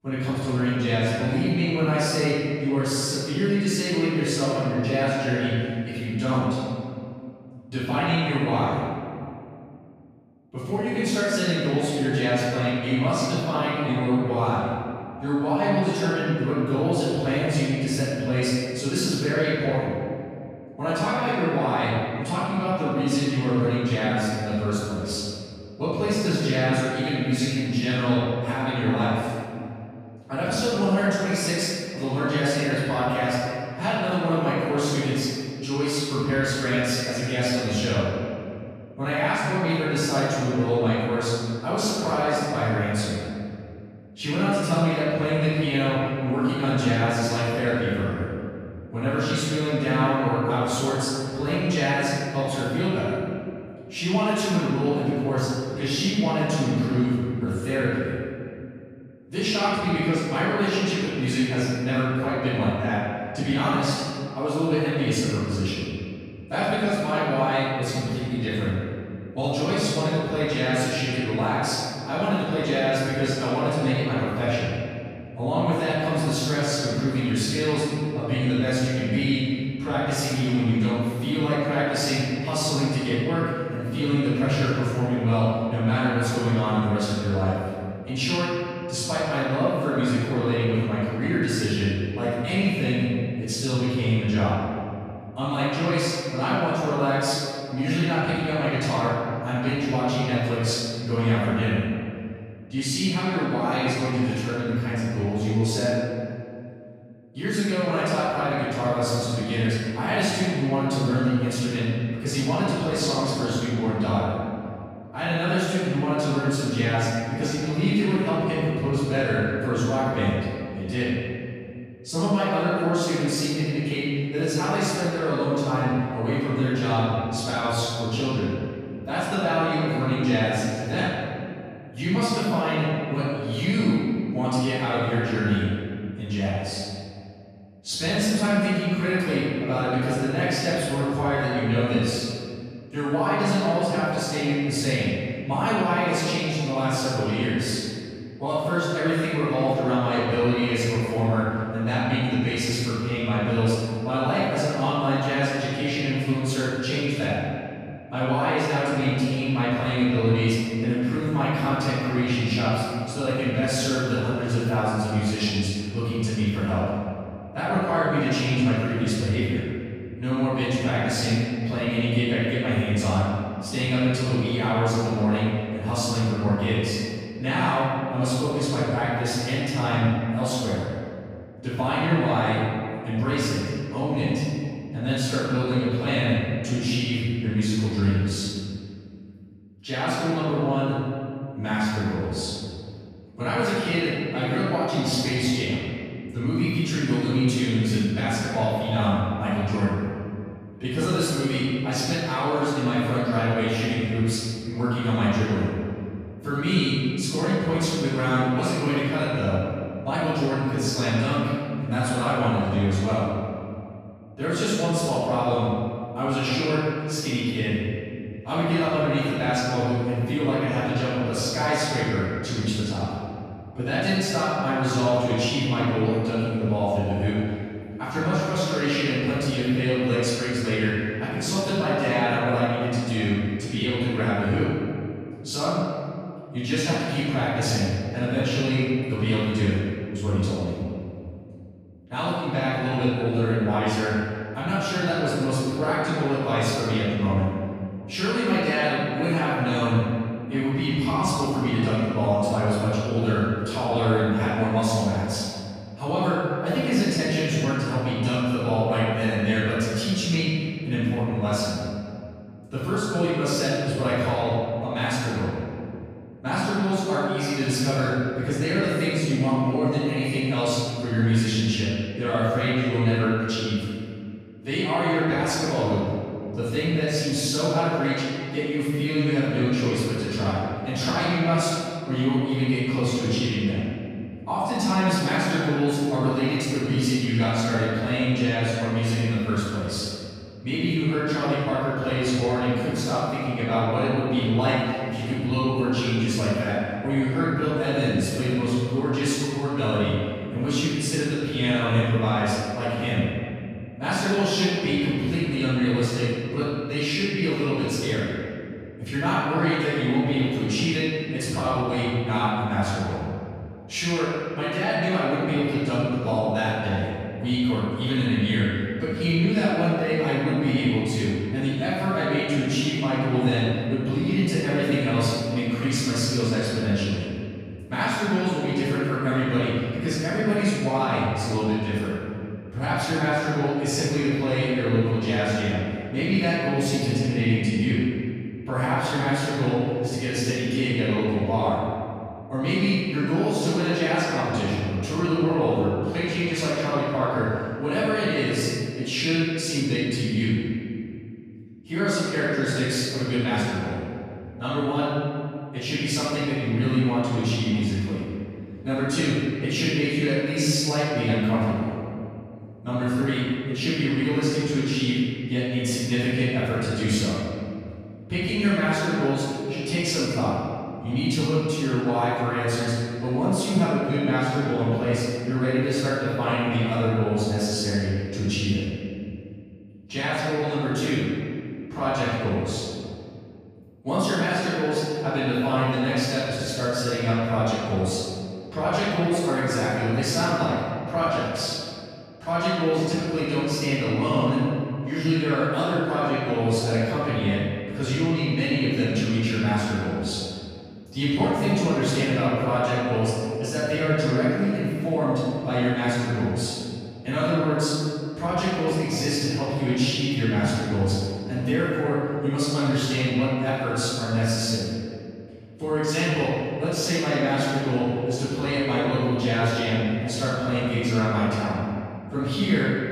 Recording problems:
room echo; strong; dies away in 2.3 s
off-mic speech; far

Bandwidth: 14.5 kHz